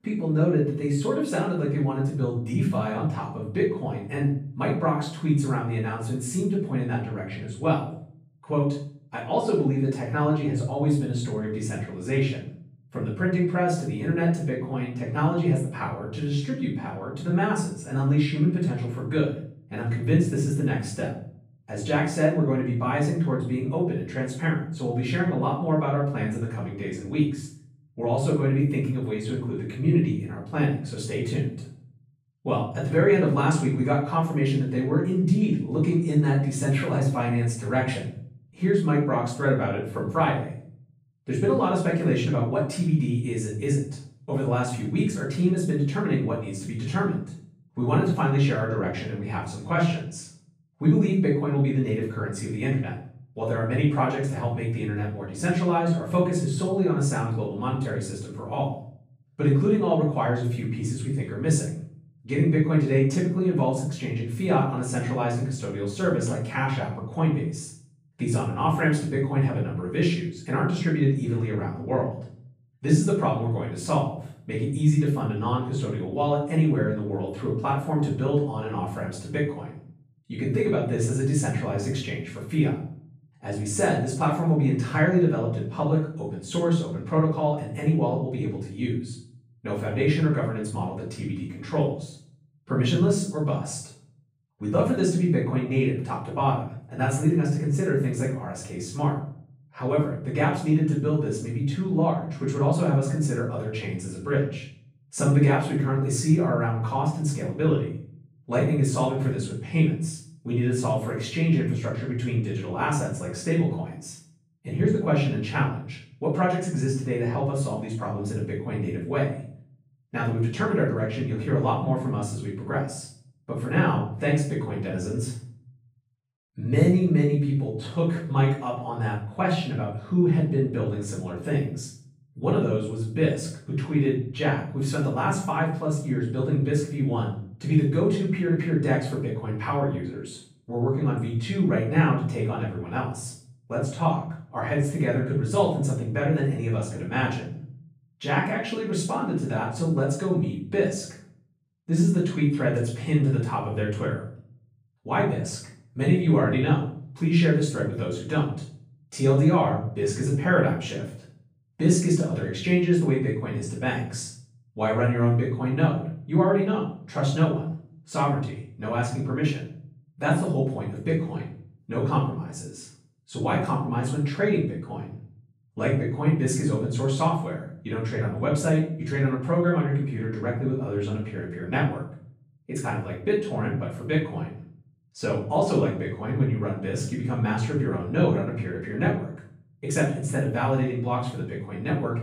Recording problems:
off-mic speech; far
room echo; noticeable; dies away in 0.6 s

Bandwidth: 15.5 kHz